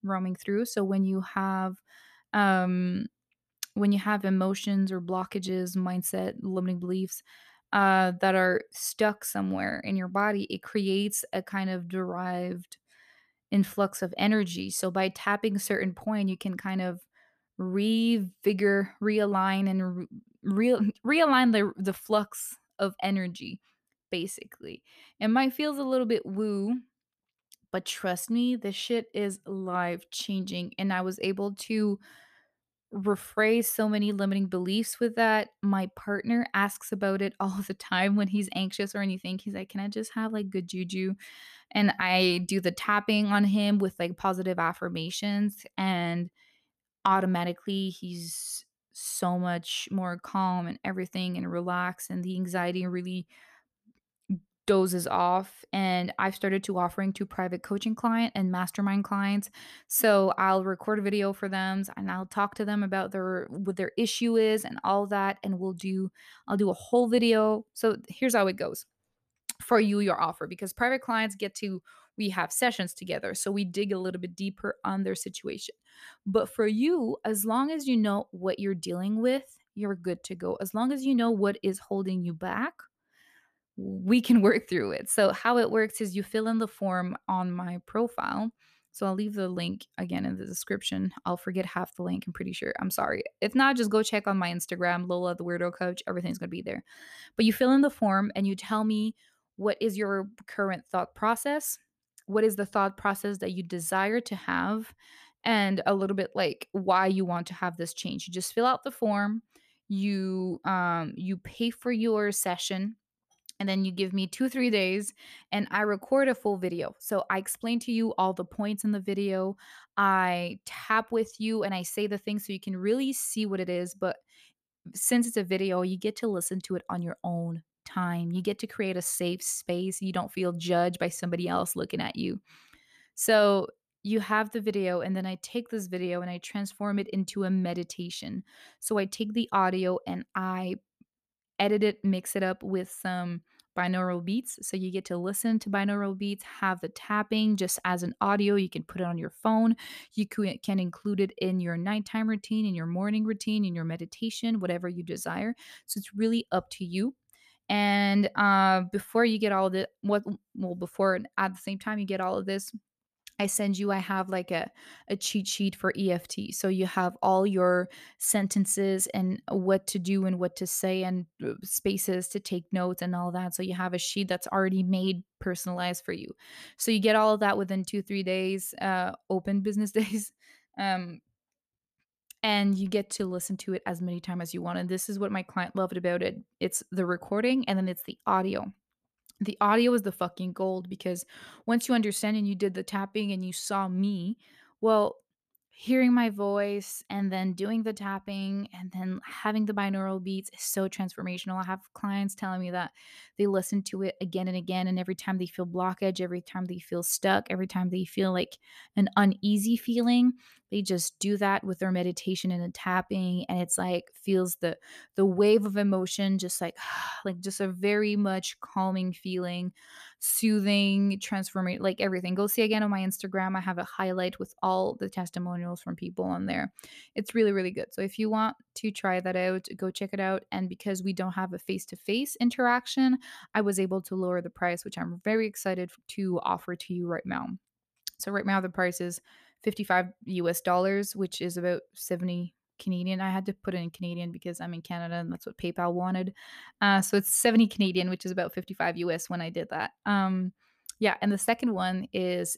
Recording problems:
none

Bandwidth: 14.5 kHz